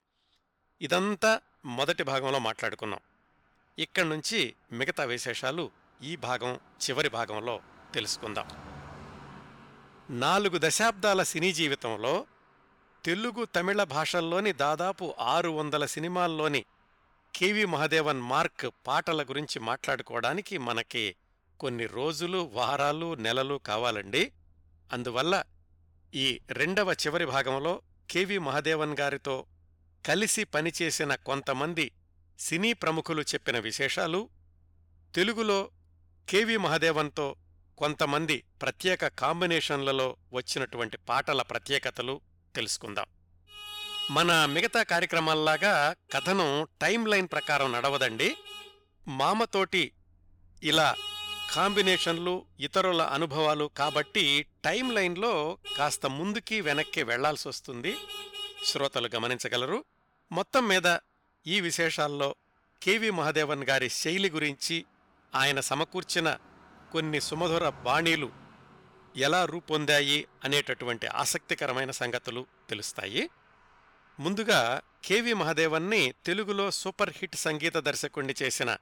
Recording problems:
traffic noise; noticeable; throughout; 10 dB below the speech

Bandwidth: 17.5 kHz